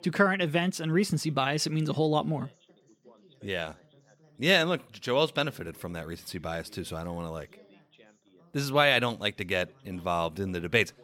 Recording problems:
background chatter; faint; throughout; 2 voices, 30 dB below the speech

